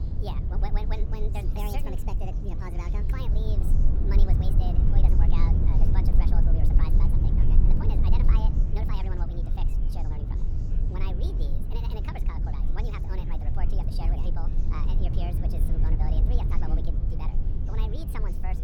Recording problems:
wrong speed and pitch; too fast and too high; 1.7 times normal speed
low rumble; loud; throughout; 1 dB below the speech
chatter from many people; noticeable; throughout; 15 dB below the speech

